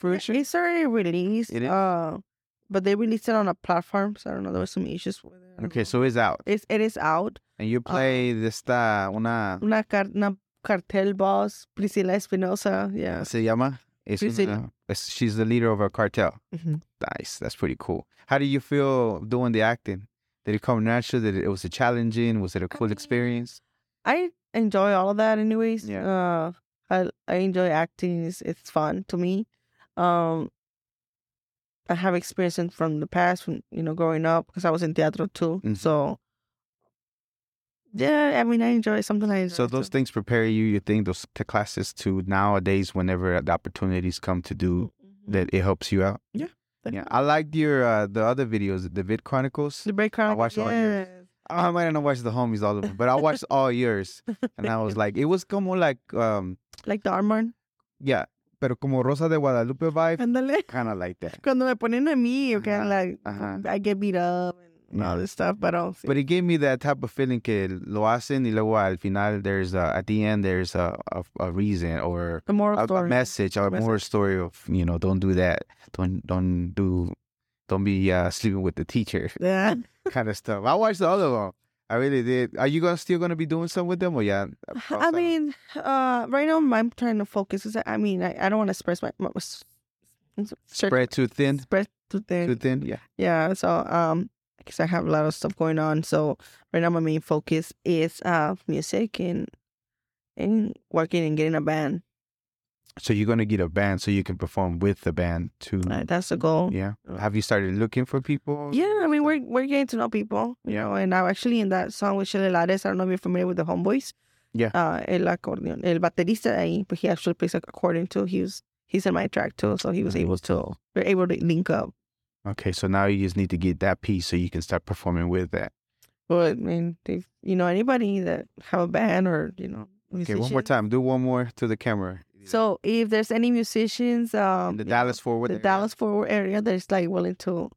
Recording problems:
none

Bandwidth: 17.5 kHz